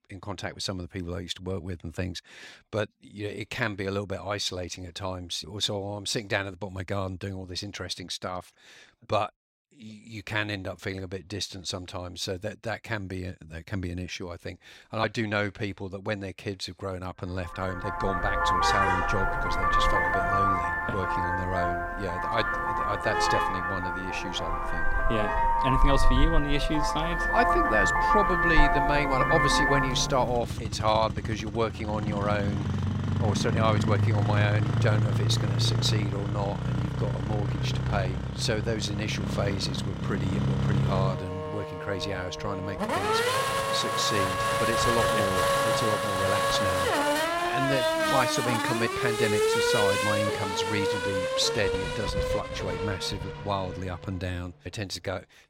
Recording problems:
traffic noise; very loud; from 18 s on; 4 dB above the speech

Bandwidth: 16 kHz